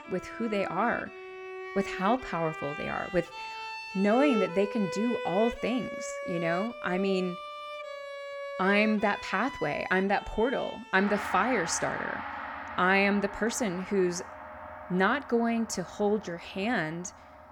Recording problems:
background music; loud; throughout; 9 dB below the speech

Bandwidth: 18 kHz